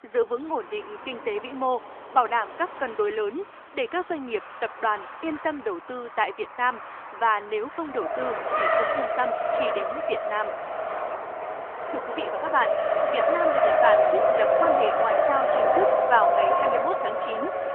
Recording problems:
phone-call audio; nothing above 3 kHz
traffic noise; very loud; throughout; 5 dB above the speech

